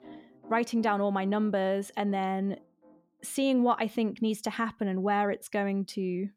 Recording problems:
background music; faint; throughout; 25 dB below the speech

